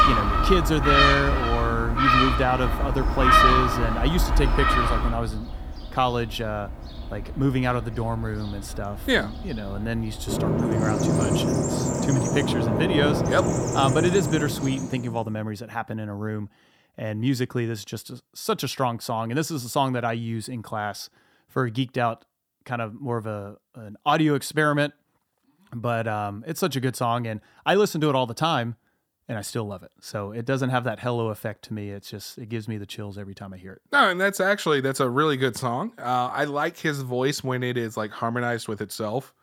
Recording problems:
animal sounds; very loud; until 14 s; 3 dB above the speech

